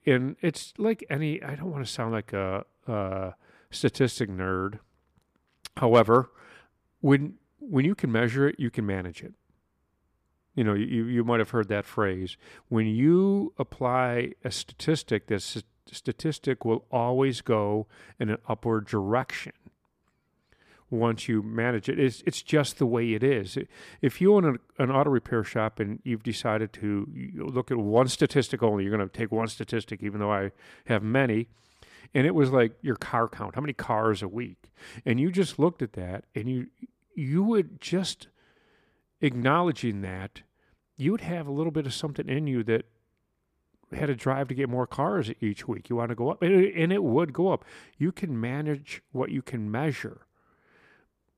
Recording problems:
none

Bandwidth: 15 kHz